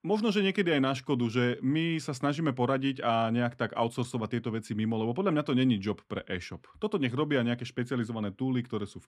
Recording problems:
none

